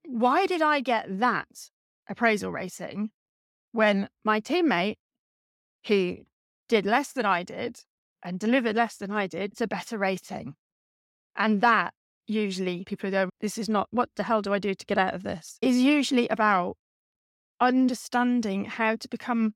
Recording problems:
none

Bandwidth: 16.5 kHz